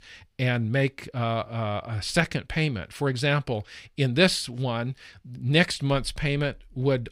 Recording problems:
none

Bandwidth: 15.5 kHz